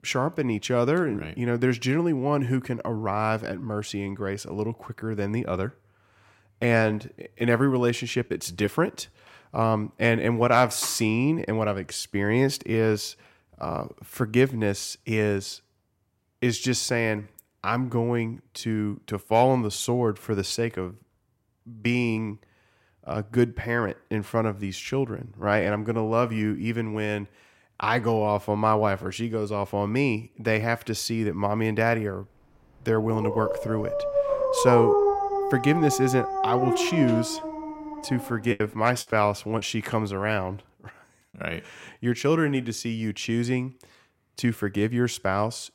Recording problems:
dog barking; loud; from 33 to 38 s; peak 5 dB above the speech
choppy; occasionally; from 39 to 40 s; 5% of the speech affected

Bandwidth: 16 kHz